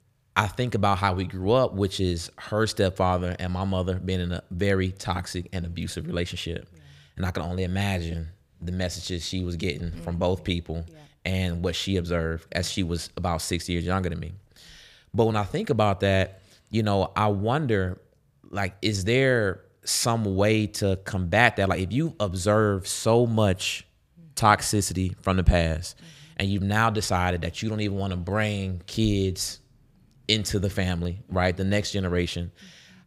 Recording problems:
none

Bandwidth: 15 kHz